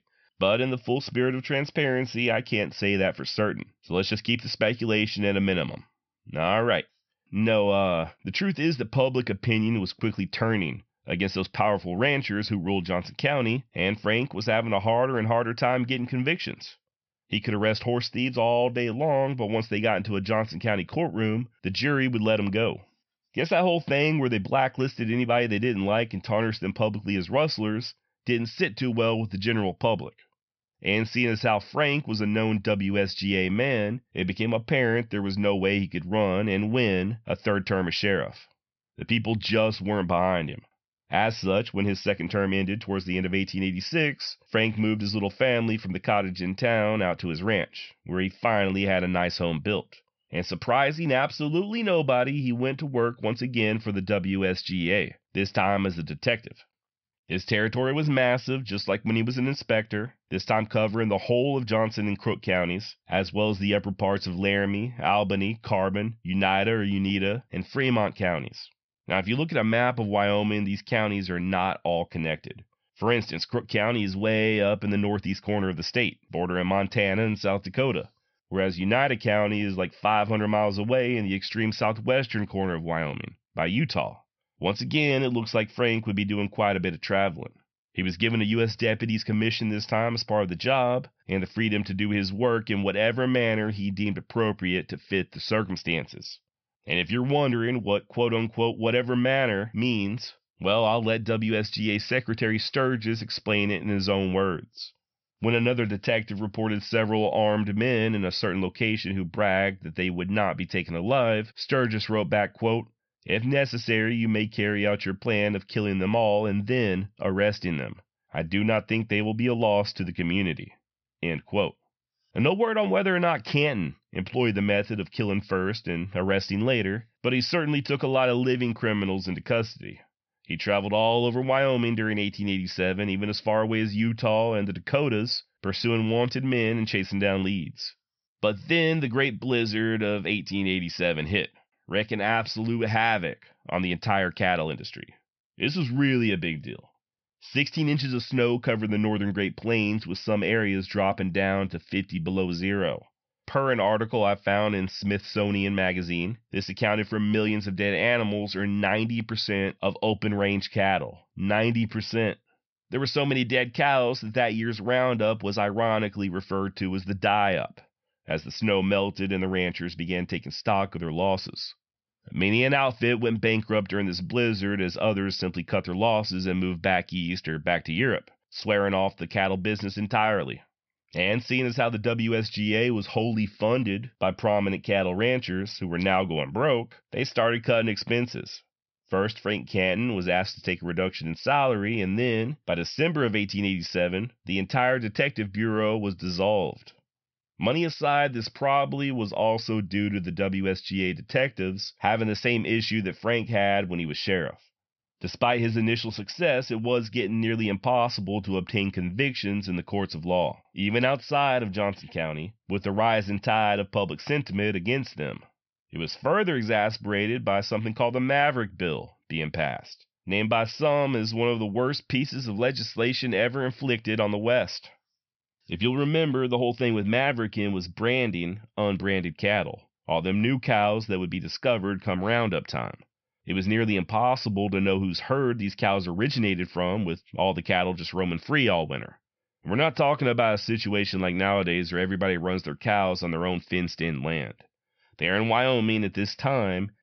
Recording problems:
high frequencies cut off; noticeable; nothing above 5.5 kHz

